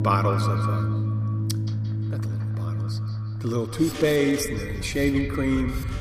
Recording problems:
echo of what is said; strong; throughout; 170 ms later, 8 dB below the speech
animal sounds; loud; throughout; 7 dB below the speech
background music; loud; throughout; 2 dB below the speech

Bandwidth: 15 kHz